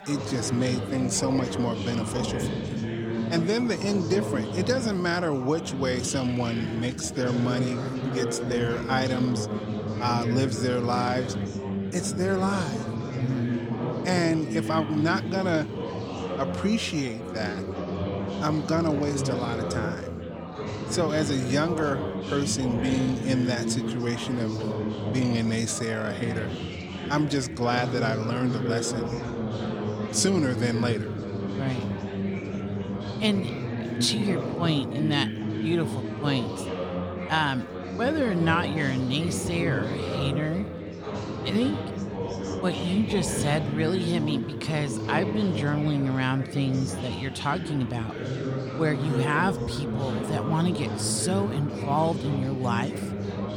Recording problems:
chatter from many people; loud; throughout; 3 dB below the speech

